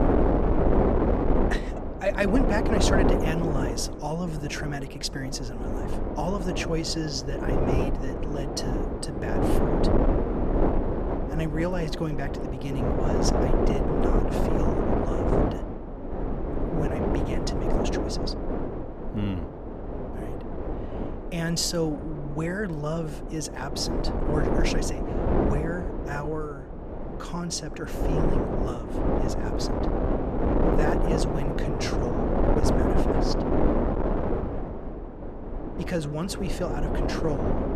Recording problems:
wind noise on the microphone; heavy; 3 dB above the speech

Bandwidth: 15 kHz